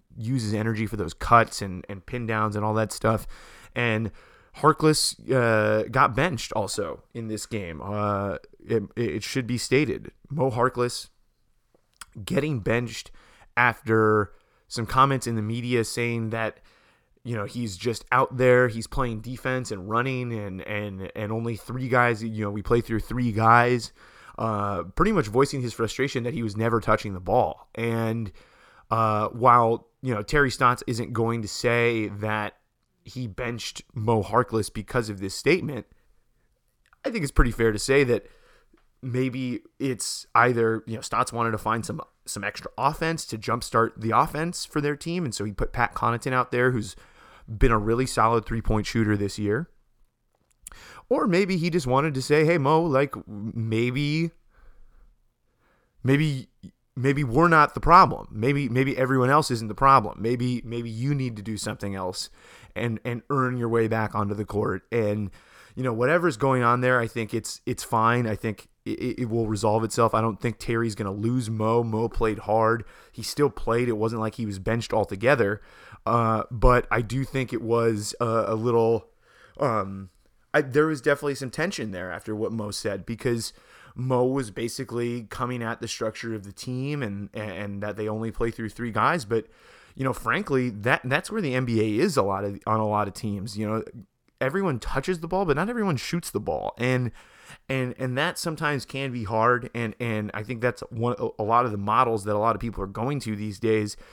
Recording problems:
none

